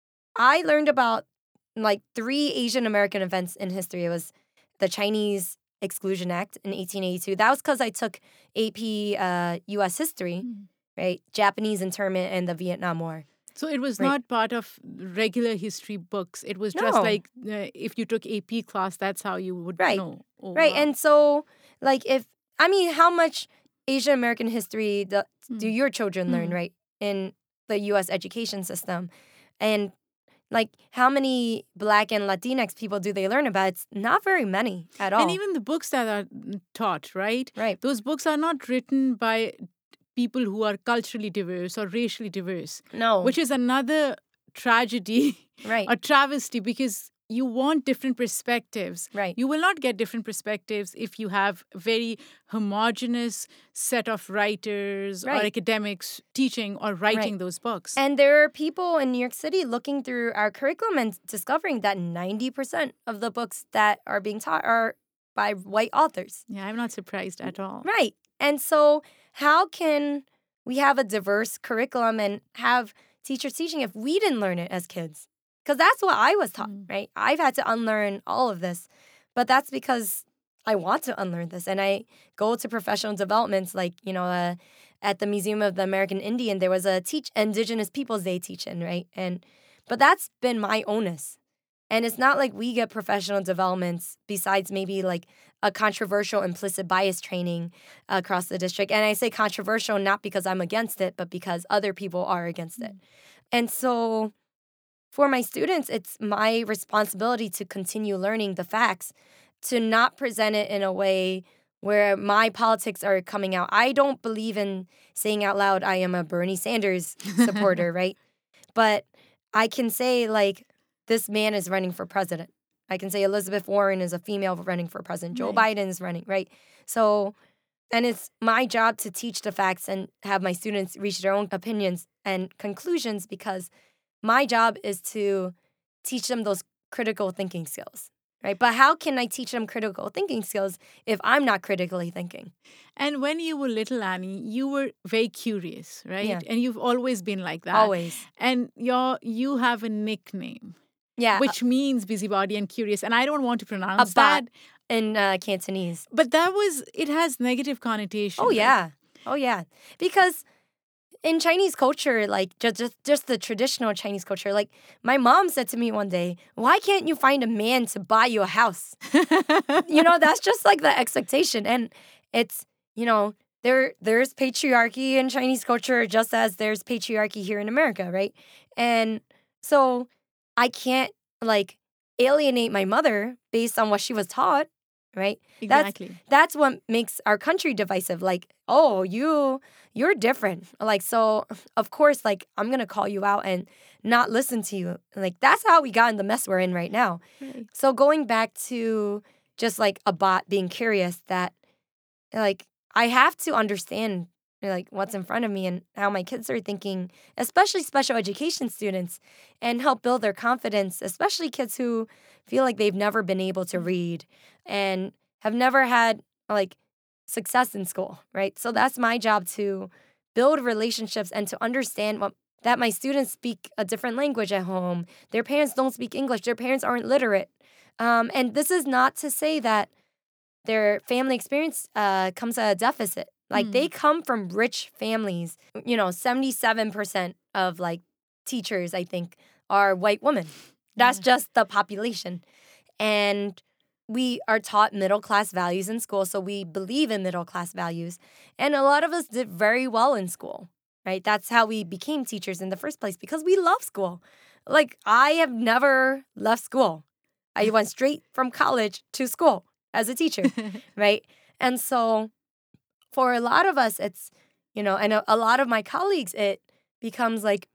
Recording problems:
none

